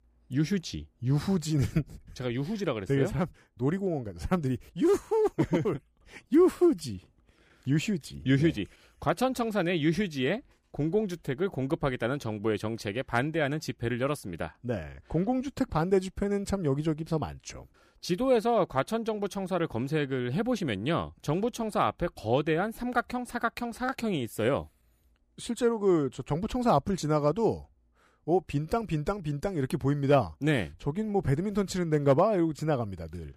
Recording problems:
none

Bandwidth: 15 kHz